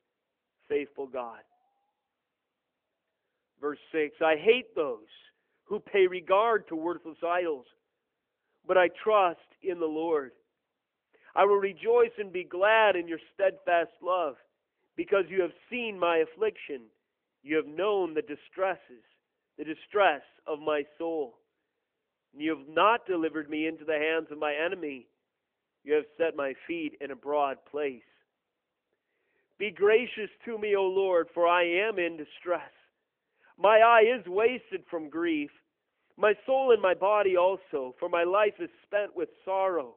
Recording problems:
phone-call audio; nothing above 3 kHz

